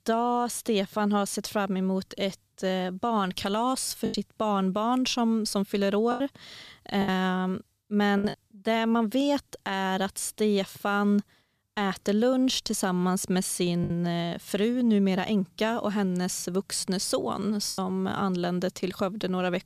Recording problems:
choppy; occasionally; 3% of the speech affected

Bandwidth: 14.5 kHz